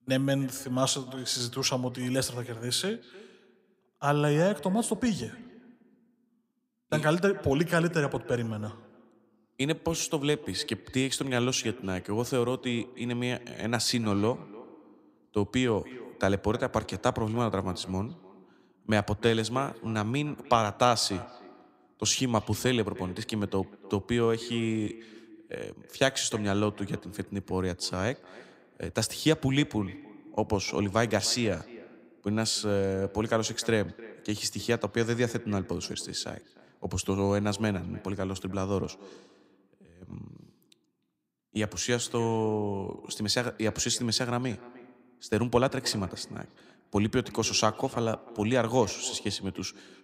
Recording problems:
echo of what is said; faint; throughout; 300 ms later, 20 dB below the speech

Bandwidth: 15.5 kHz